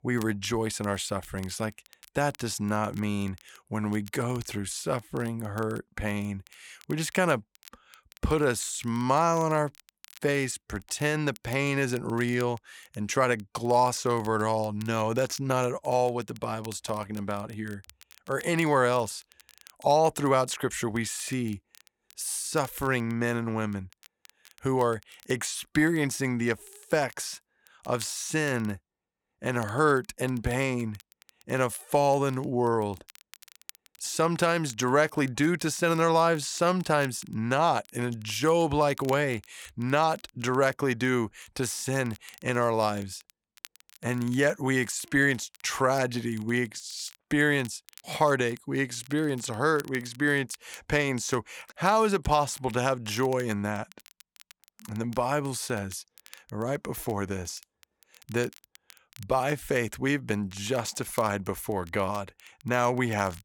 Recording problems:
crackle, like an old record; faint; 25 dB below the speech

